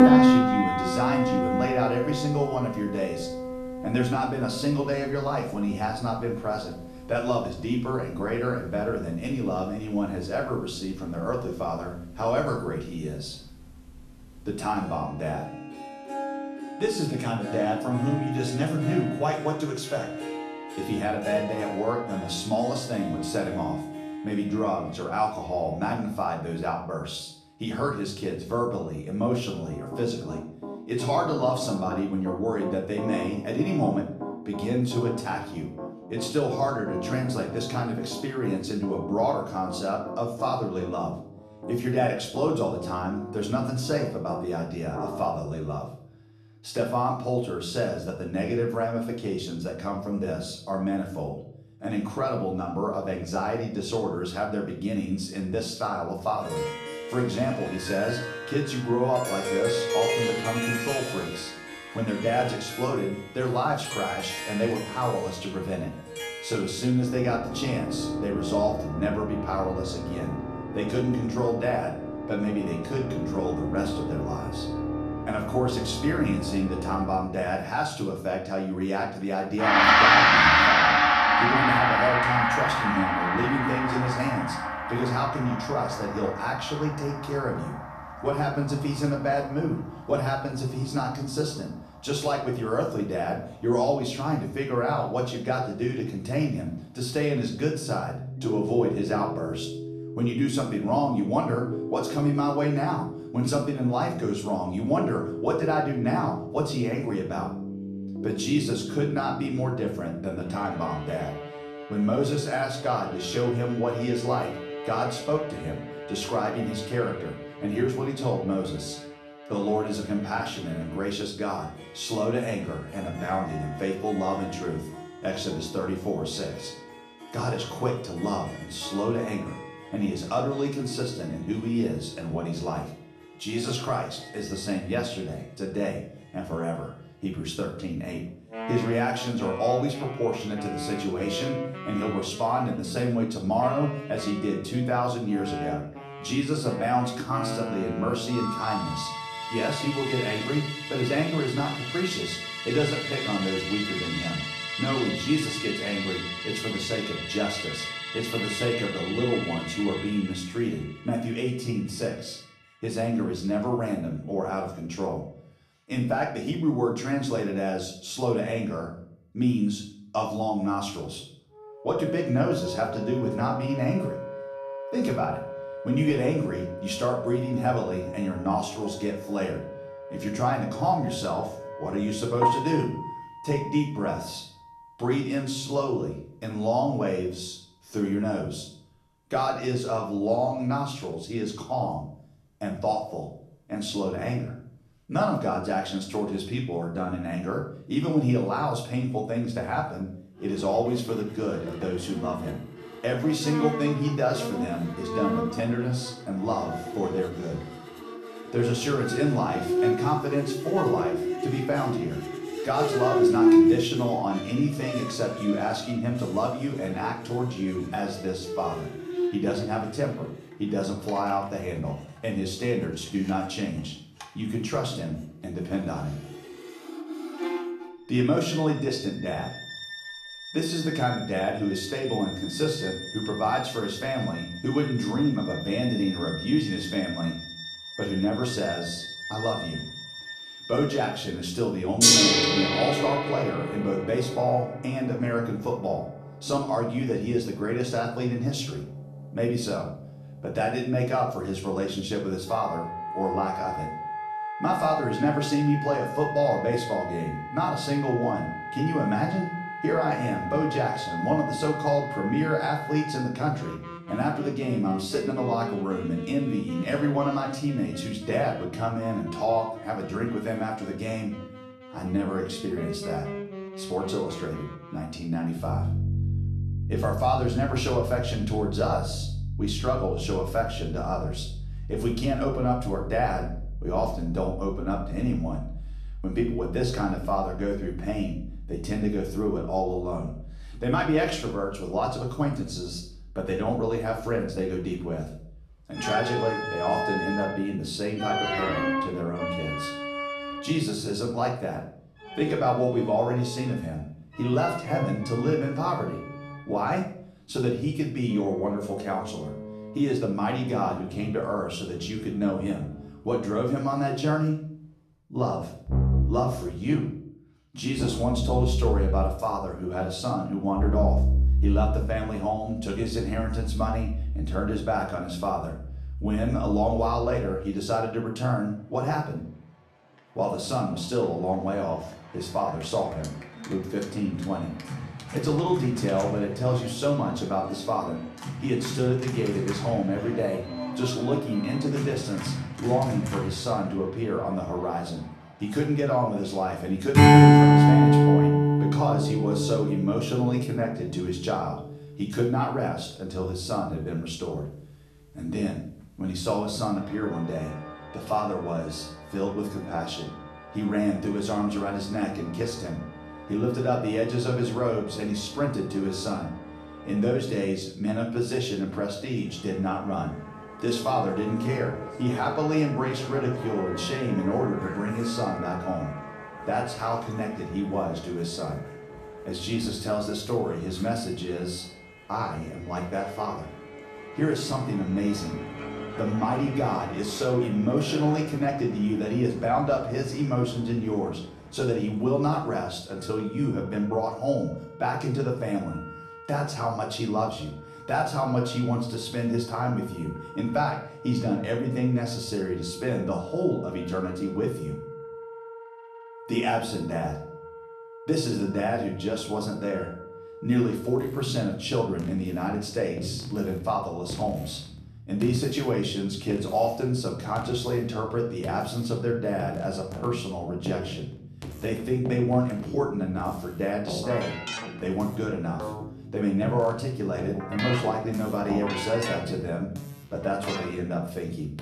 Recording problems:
off-mic speech; far
room echo; slight; dies away in 0.5 s
background music; loud; throughout; 2 dB below the speech

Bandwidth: 13.5 kHz